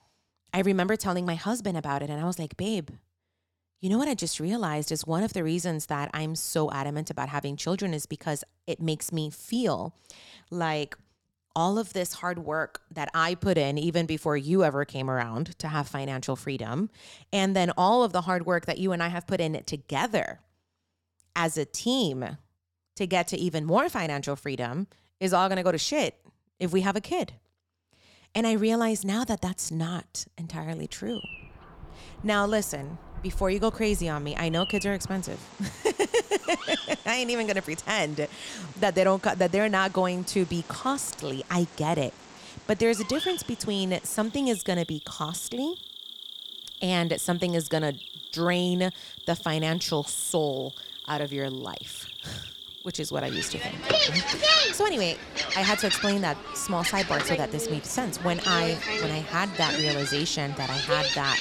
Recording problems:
animal sounds; loud; from 31 s on; 2 dB below the speech

